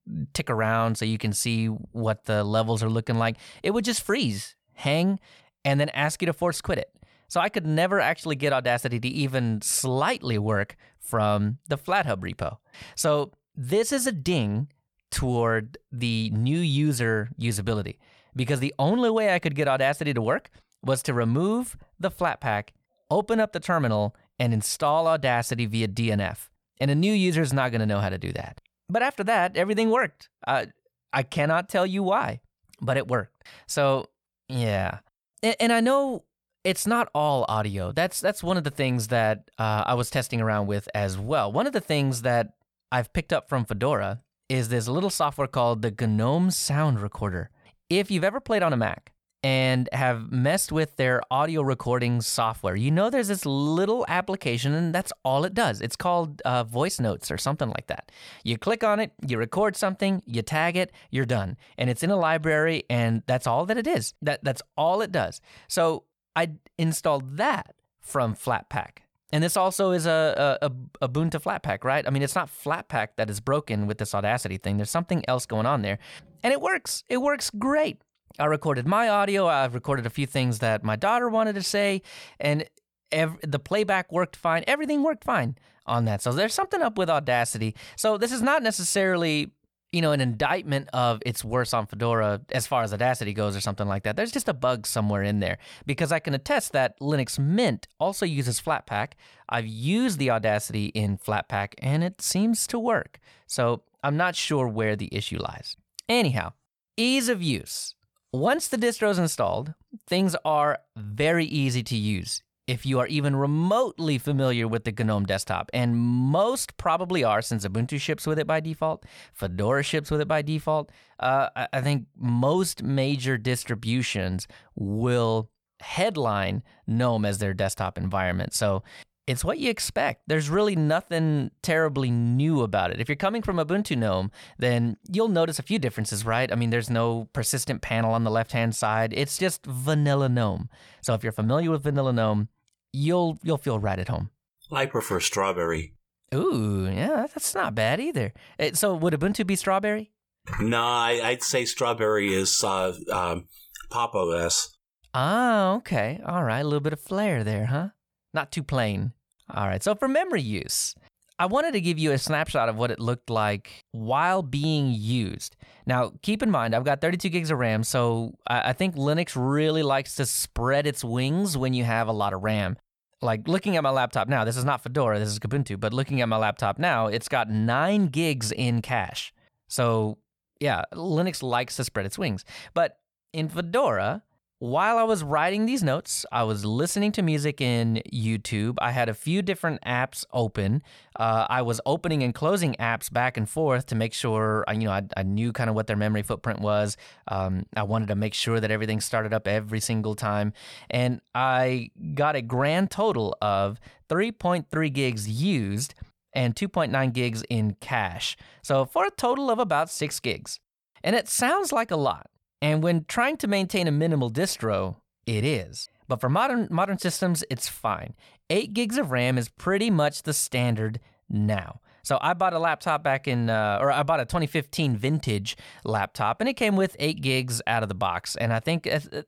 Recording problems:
none

